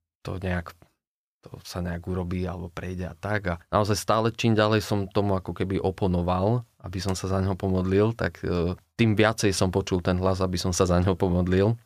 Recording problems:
none

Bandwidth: 15 kHz